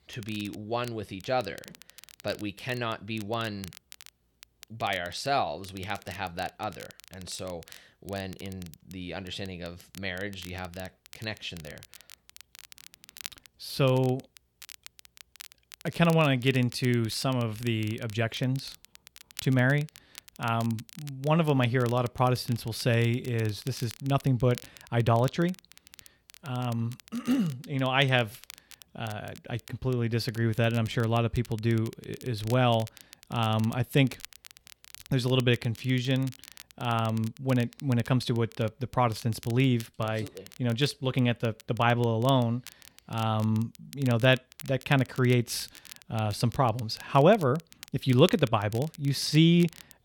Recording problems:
crackle, like an old record; faint; 20 dB below the speech

